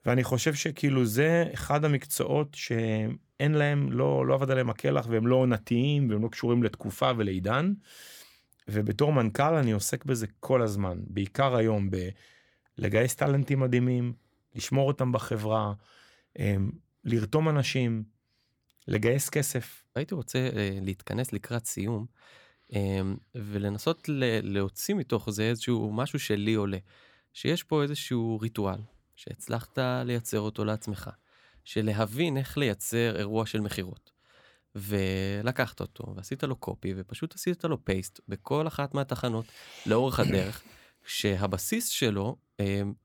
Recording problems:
none

